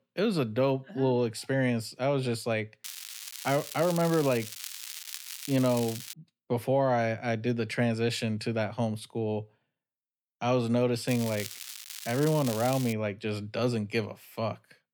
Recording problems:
crackling; loud; from 3 to 6 s and from 11 to 13 s; 10 dB below the speech

